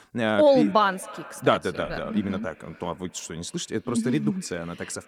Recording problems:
echo of what is said; faint; throughout; 270 ms later, 20 dB below the speech

